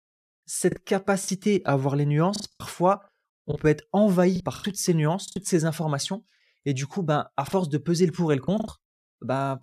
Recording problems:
choppy; very; from 0.5 to 3.5 s, from 4.5 to 5.5 s and from 7.5 to 8.5 s; 10% of the speech affected

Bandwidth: 14 kHz